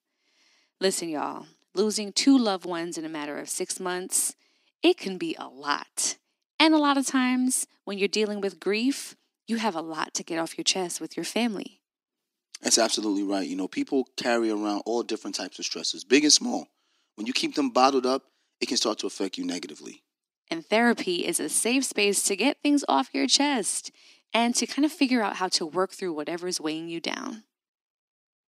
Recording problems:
thin; very slightly; fading below 250 Hz

